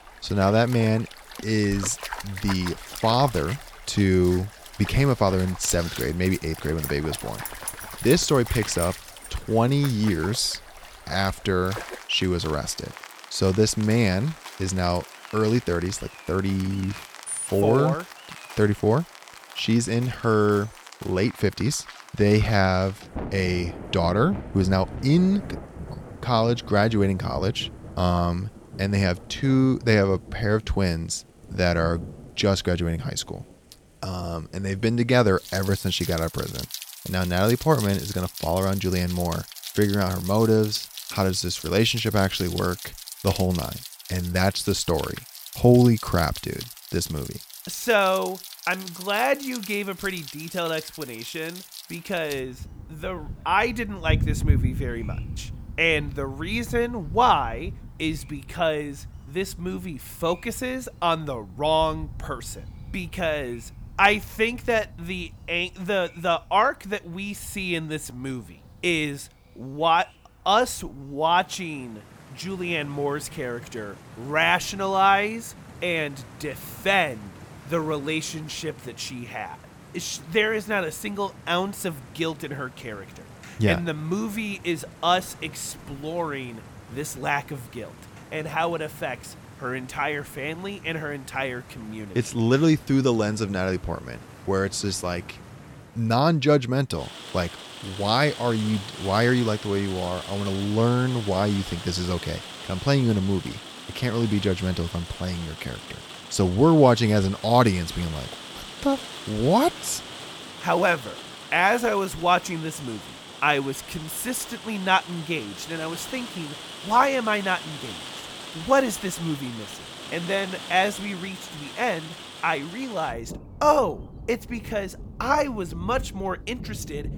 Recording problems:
rain or running water; noticeable; throughout; 15 dB below the speech

